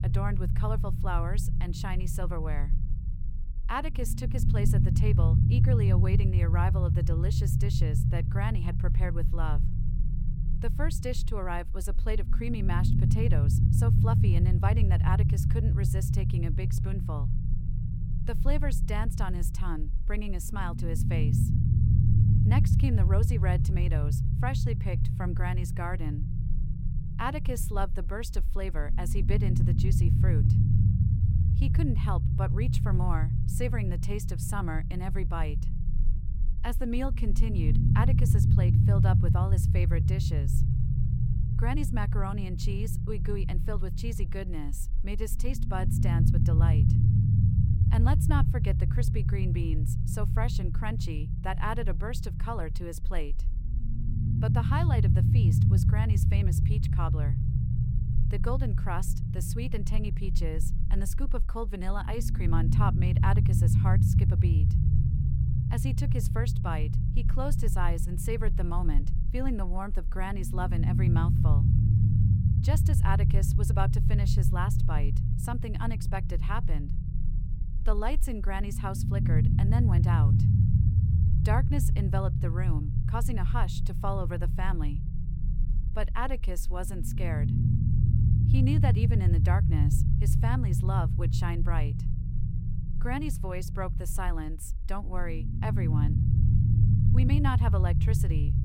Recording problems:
low rumble; loud; throughout; 2 dB below the speech

